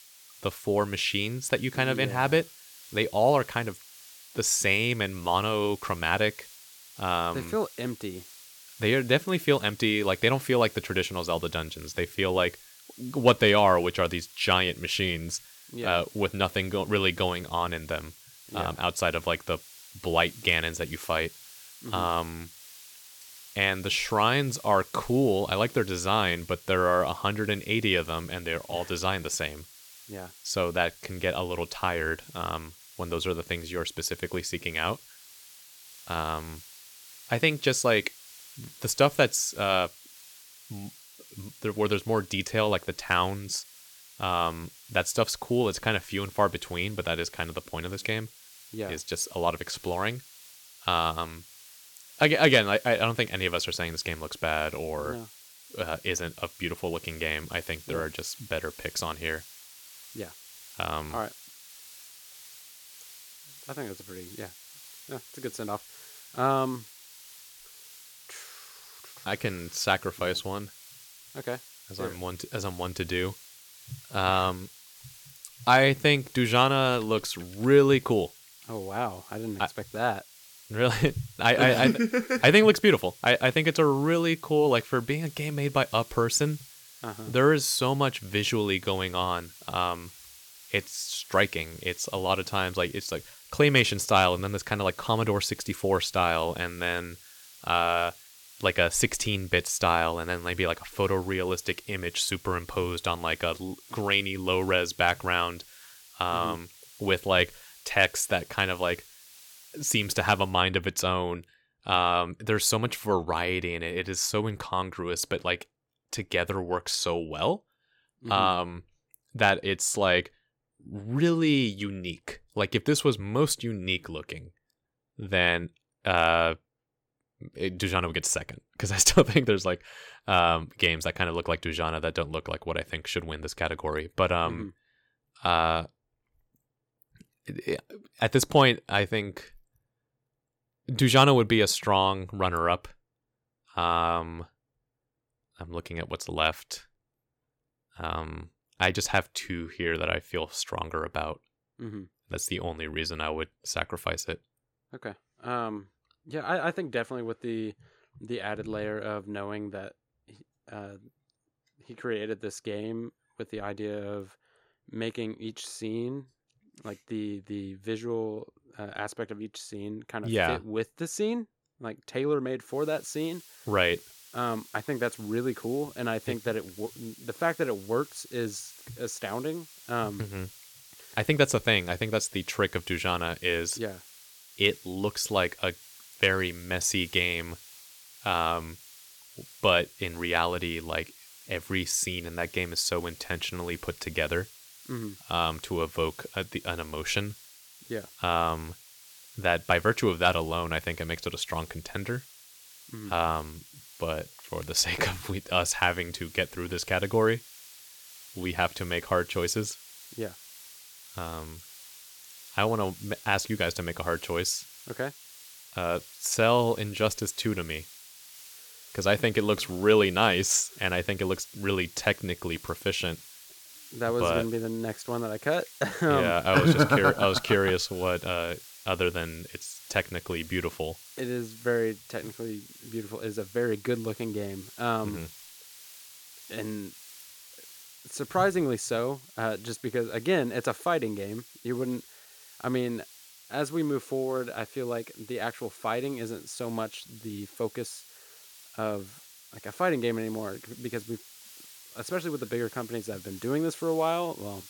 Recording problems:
hiss; noticeable; until 1:51 and from 2:53 on; 20 dB below the speech

